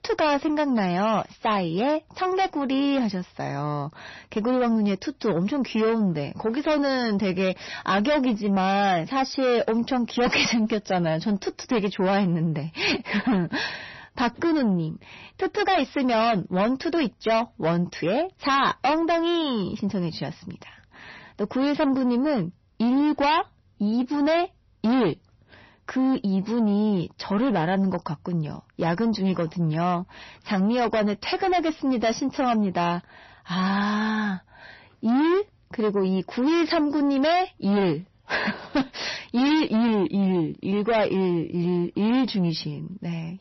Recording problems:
distortion; heavy; 6 dB below the speech
garbled, watery; slightly; nothing above 6 kHz

